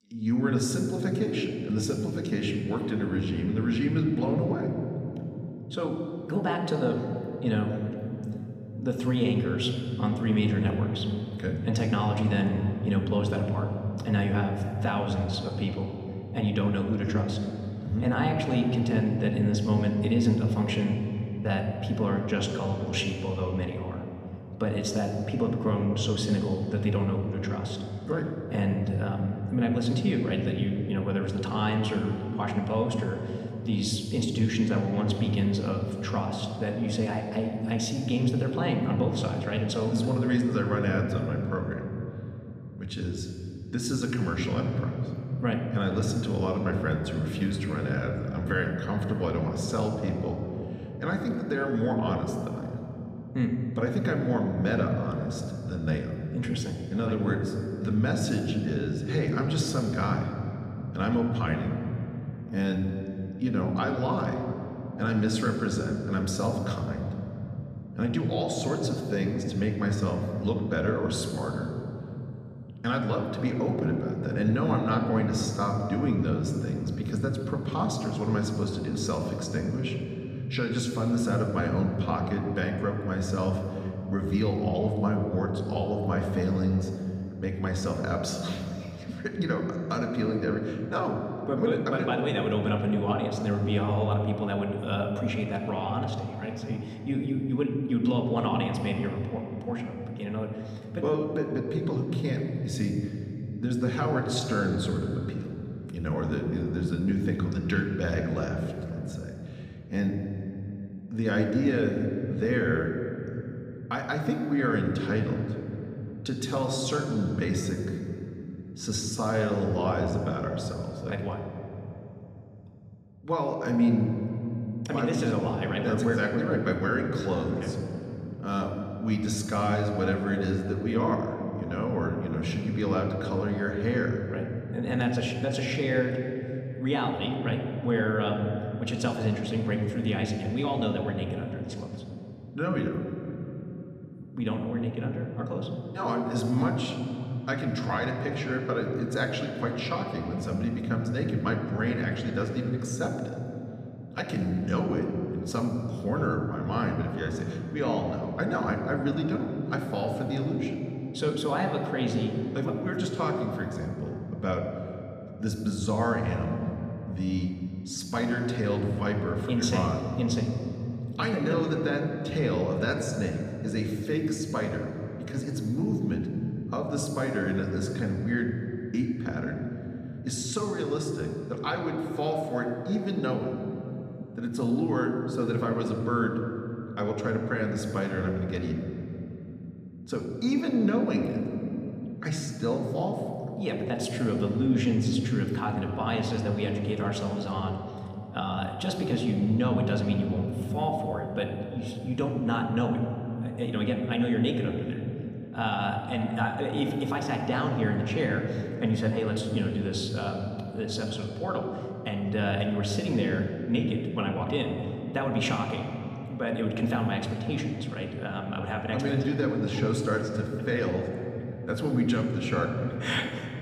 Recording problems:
room echo; noticeable; dies away in 3 s
off-mic speech; somewhat distant

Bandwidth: 14.5 kHz